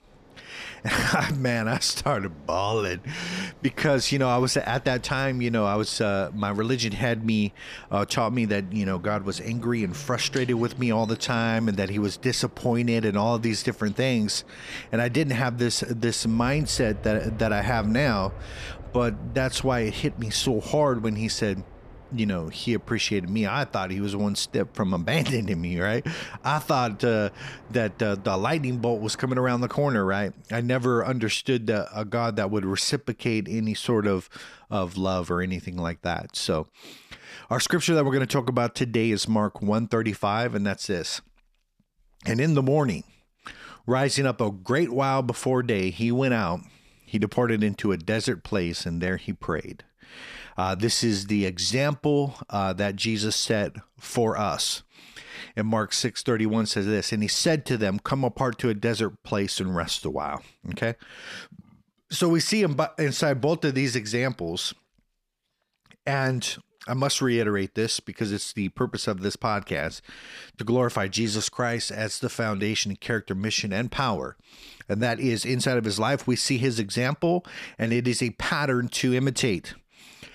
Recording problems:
train or aircraft noise; faint; until 30 s; 20 dB below the speech

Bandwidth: 14.5 kHz